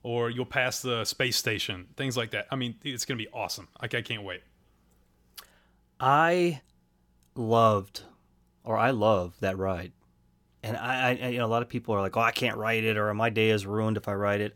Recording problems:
none

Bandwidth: 17 kHz